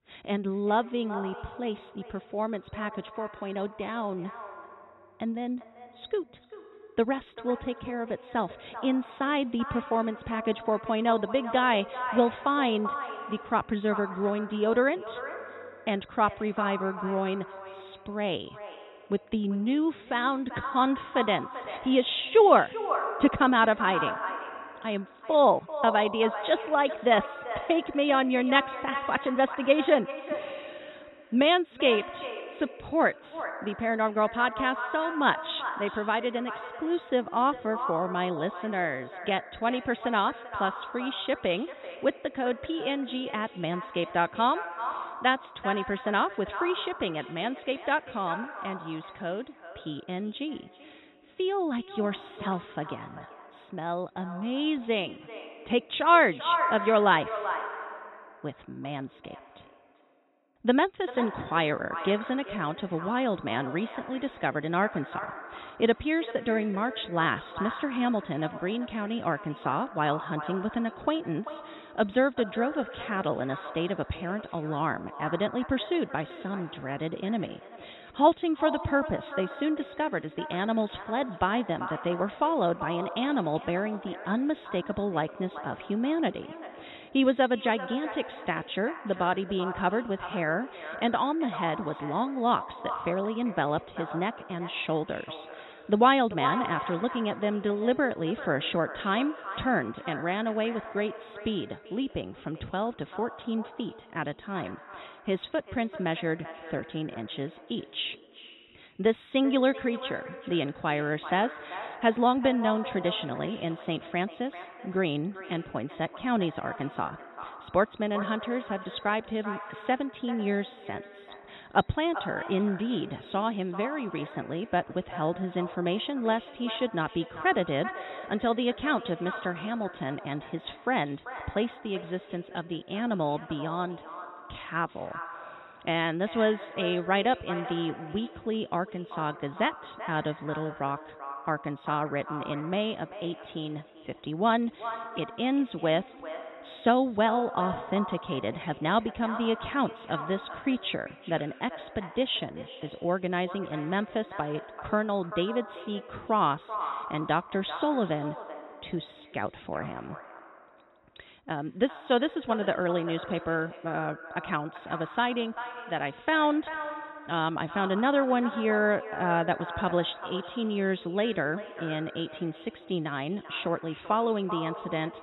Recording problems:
echo of what is said; strong; throughout; 390 ms later, 10 dB below the speech
high frequencies cut off; severe; nothing above 4 kHz

